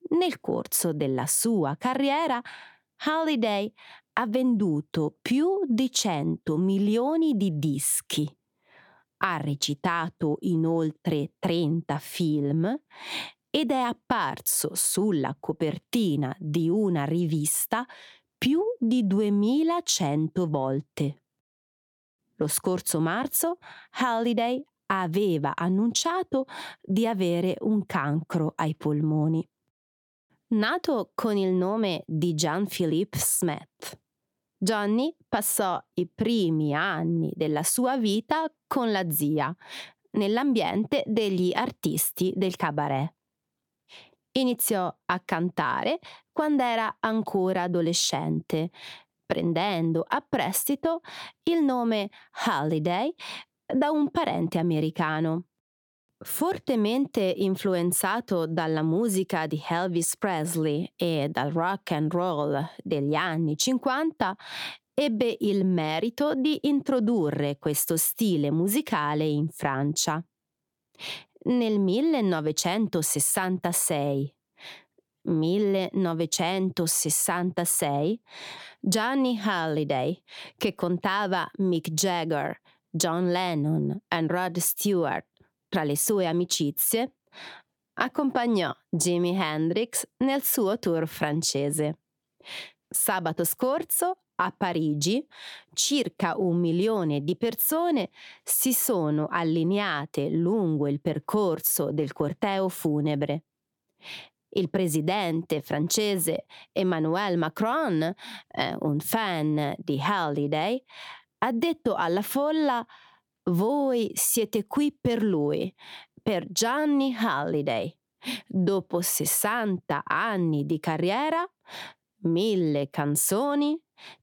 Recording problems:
squashed, flat; somewhat

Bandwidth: 18 kHz